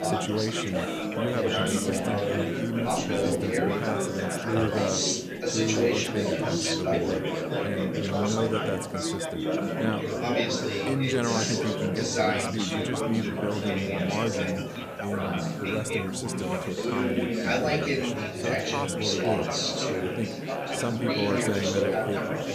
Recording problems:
chatter from many people; very loud; throughout; 4 dB above the speech
hiss; faint; throughout; 20 dB below the speech

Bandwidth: 14.5 kHz